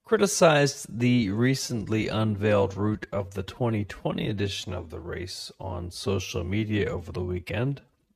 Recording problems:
wrong speed, natural pitch; too slow; 0.6 times normal speed

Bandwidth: 14.5 kHz